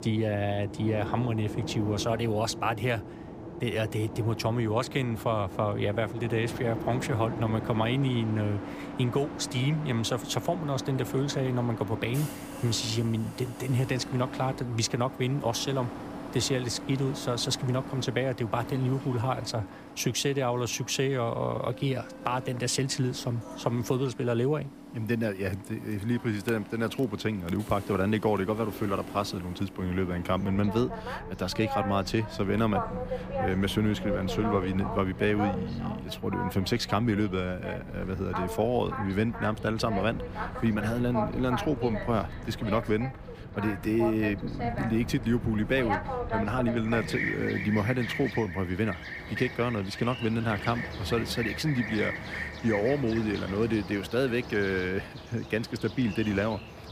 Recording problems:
train or aircraft noise; loud; throughout; 8 dB below the speech

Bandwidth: 15 kHz